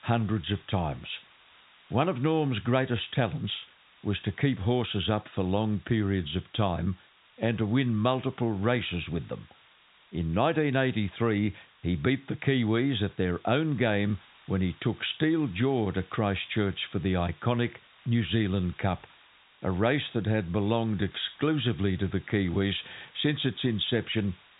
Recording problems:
high frequencies cut off; severe; nothing above 4 kHz
hiss; faint; throughout; 25 dB below the speech

